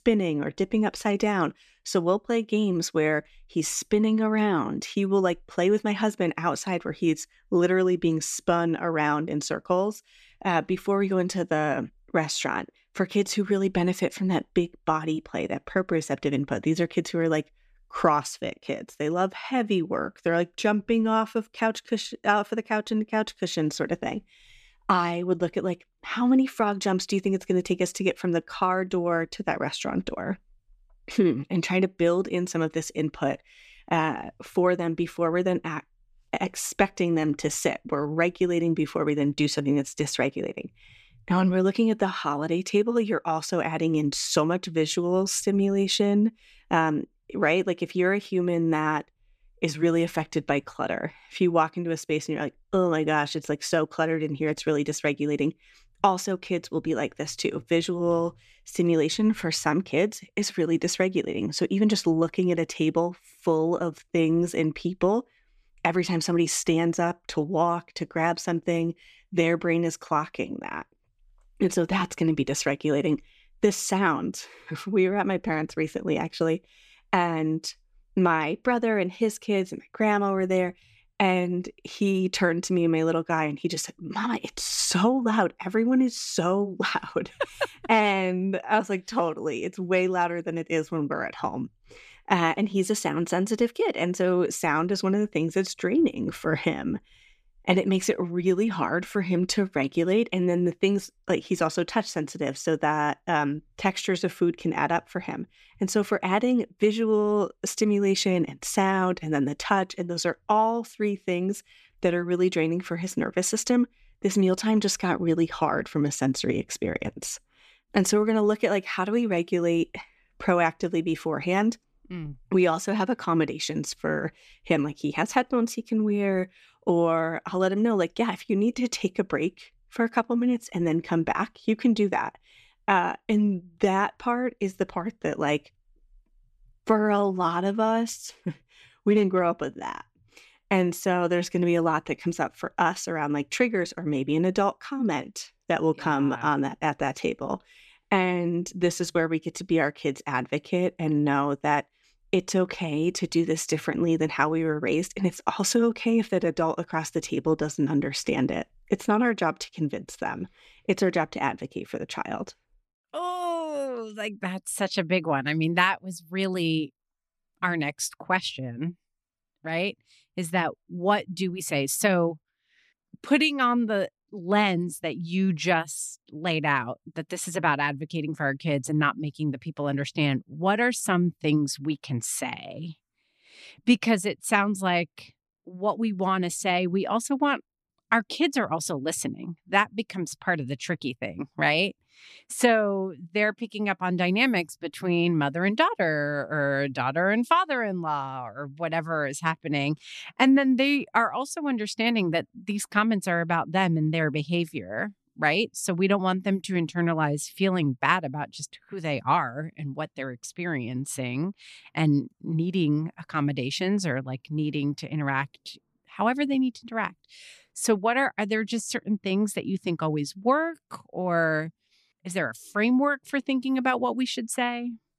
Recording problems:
none

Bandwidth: 14.5 kHz